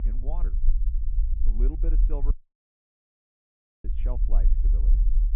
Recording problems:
muffled; very; fading above 2.5 kHz
low rumble; loud; throughout; 7 dB below the speech
audio cutting out; at 2.5 s for 1.5 s

